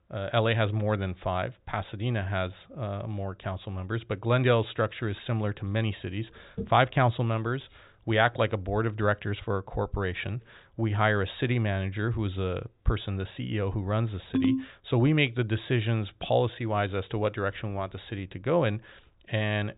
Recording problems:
high frequencies cut off; severe; nothing above 4 kHz
jangling keys; very faint; at 7.5 s; peak 30 dB below the speech
phone ringing; loud; at 14 s; peak 2 dB above the speech

